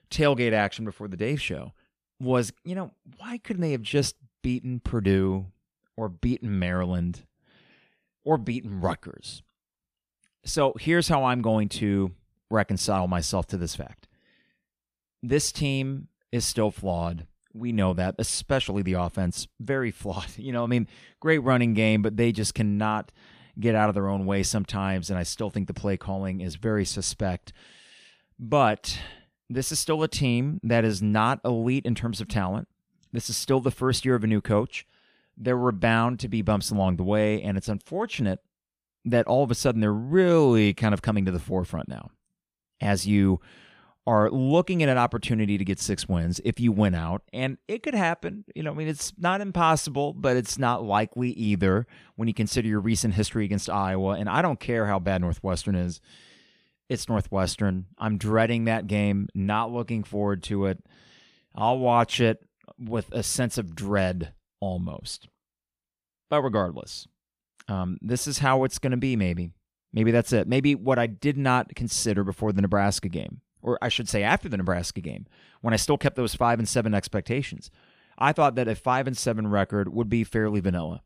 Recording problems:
none

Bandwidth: 15 kHz